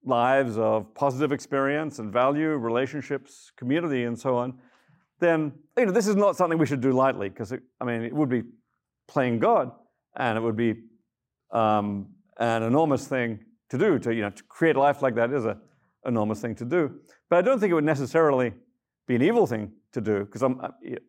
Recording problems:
none

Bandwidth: 16 kHz